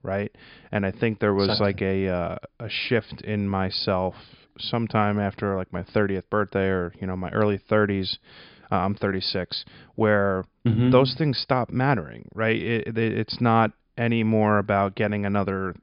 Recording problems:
high frequencies cut off; noticeable; nothing above 5 kHz

